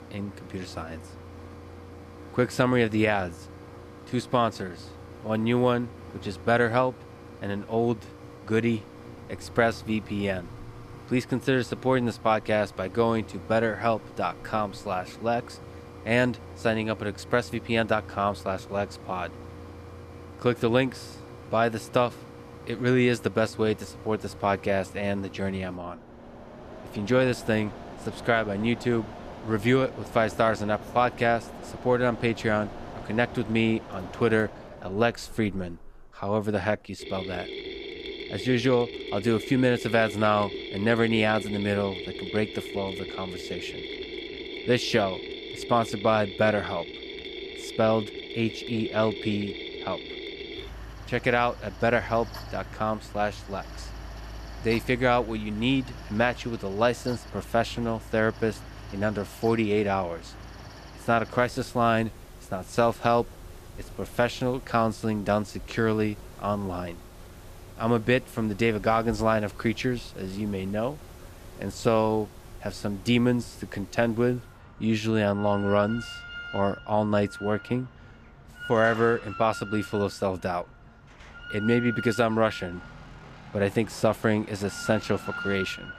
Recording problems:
machinery noise; noticeable; throughout; 15 dB below the speech

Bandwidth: 14.5 kHz